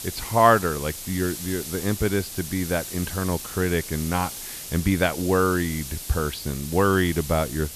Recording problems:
high frequencies cut off; slight; nothing above 5.5 kHz
hiss; loud; throughout; 9 dB below the speech

